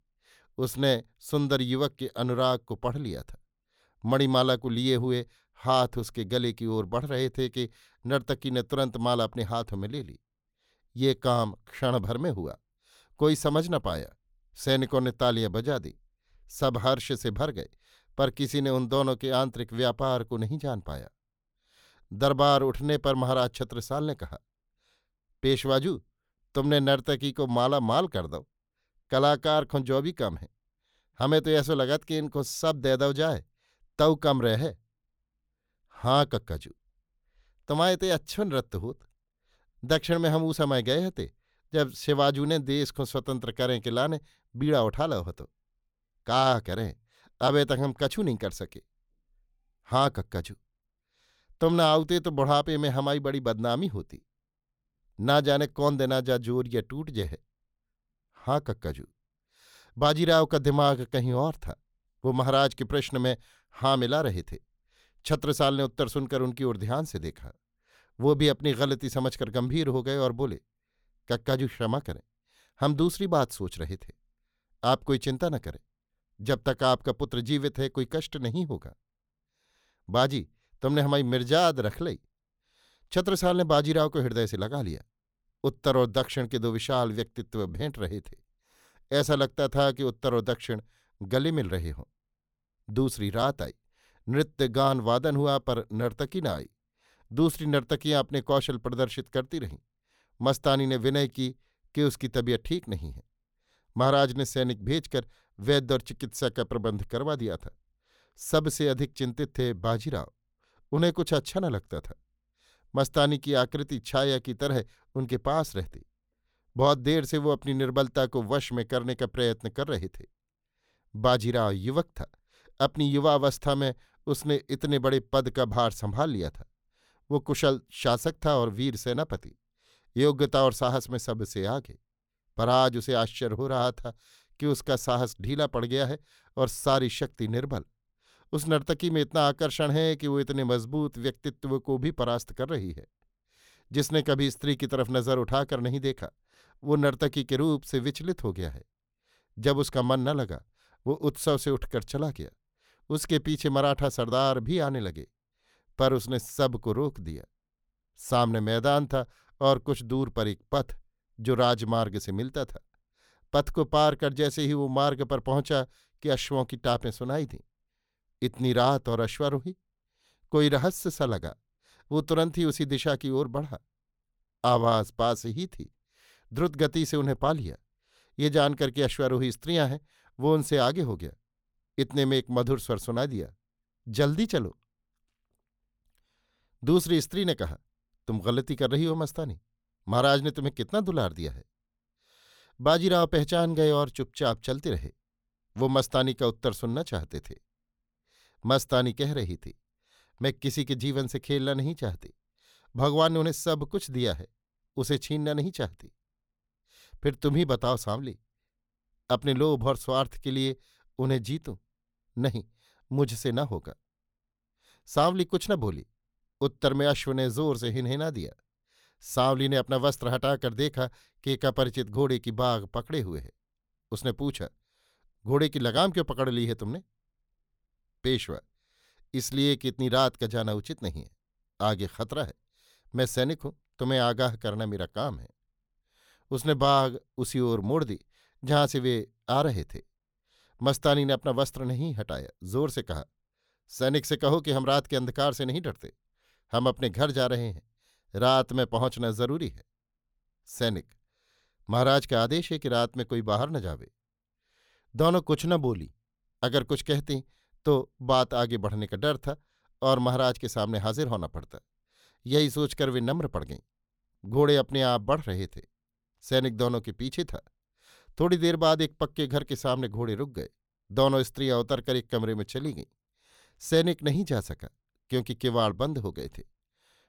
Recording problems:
none

